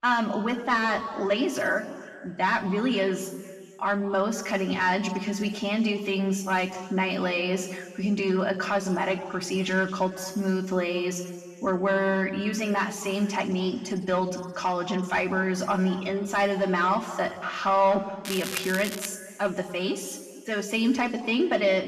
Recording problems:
off-mic speech; far
room echo; slight; dies away in 1.7 s
crackling; loud; at 18 s; 8 dB below the speech

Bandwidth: 14 kHz